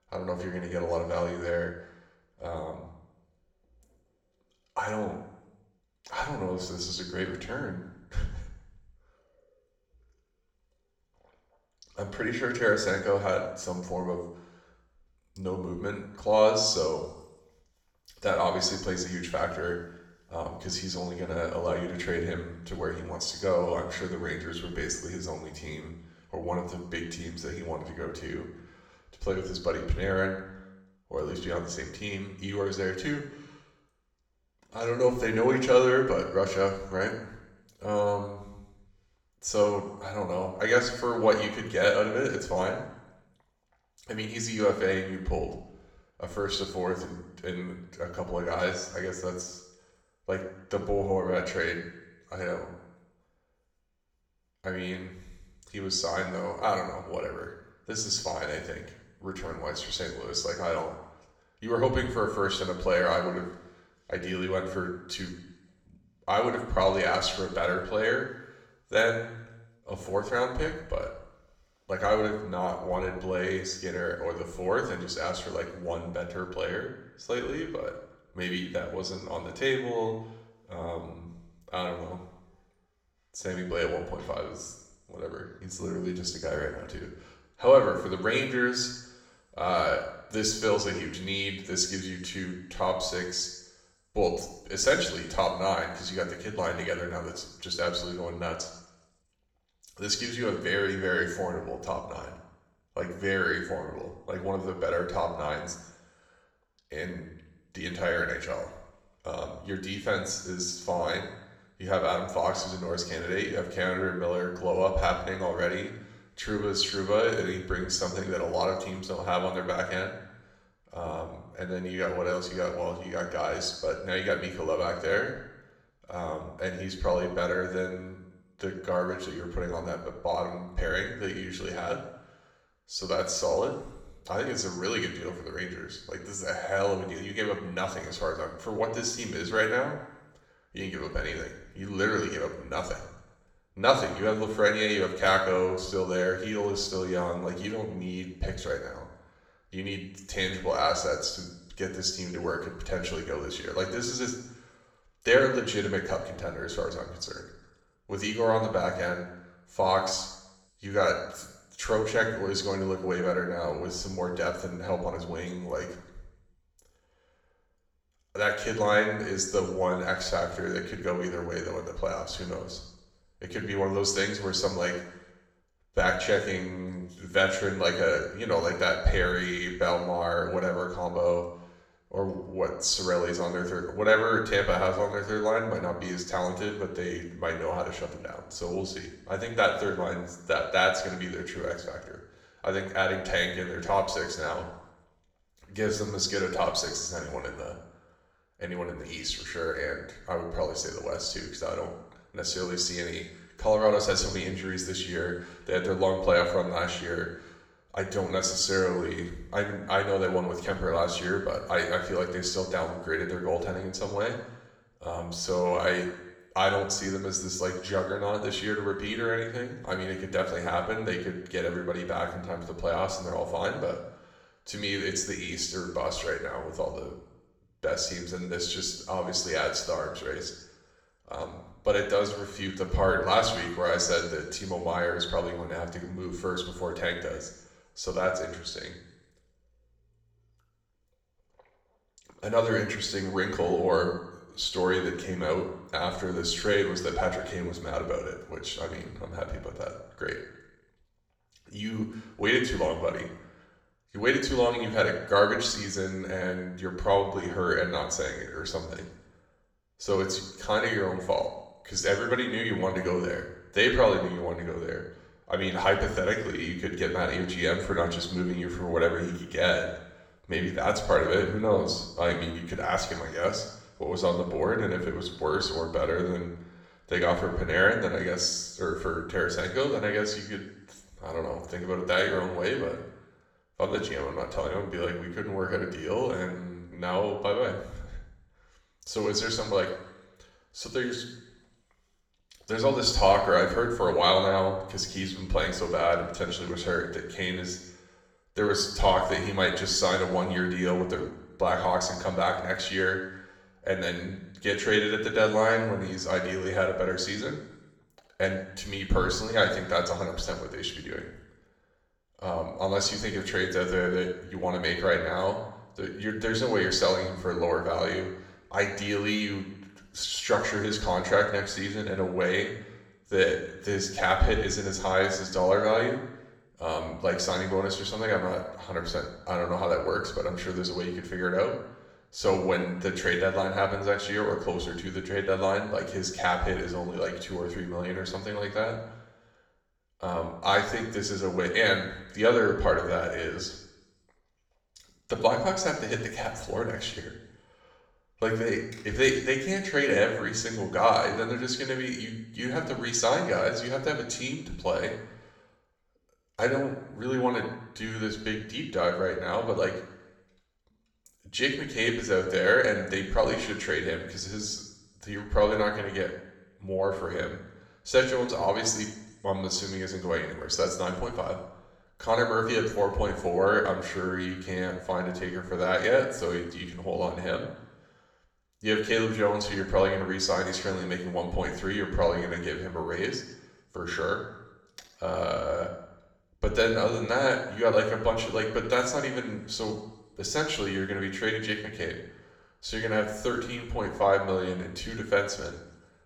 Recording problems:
room echo; slight; dies away in 0.8 s
off-mic speech; somewhat distant

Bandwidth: 18.5 kHz